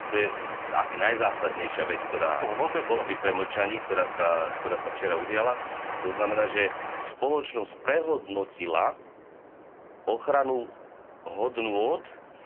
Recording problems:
phone-call audio; poor line
traffic noise; loud; throughout; 7 dB below the speech

